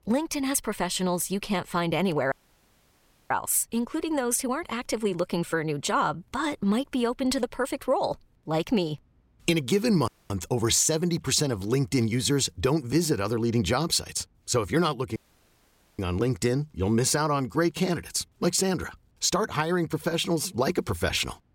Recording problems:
audio cutting out; at 2.5 s for 1 s, at 10 s and at 15 s for 1 s

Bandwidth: 16.5 kHz